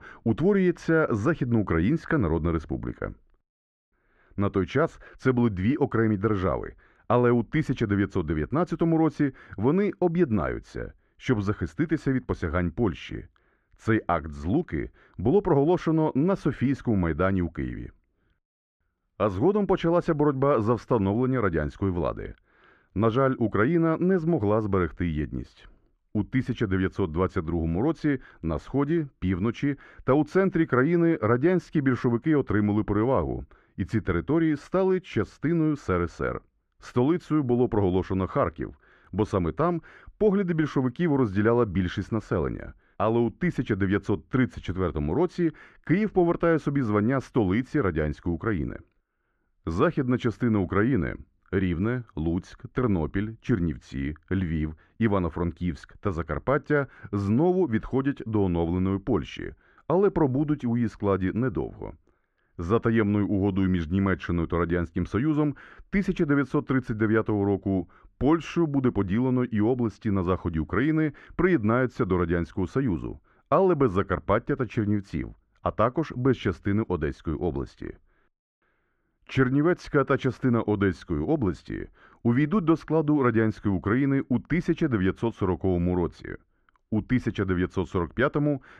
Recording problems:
muffled; very; fading above 2 kHz

